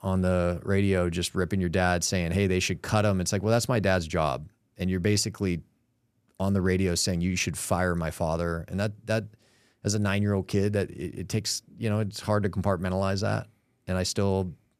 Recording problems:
none

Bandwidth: 14 kHz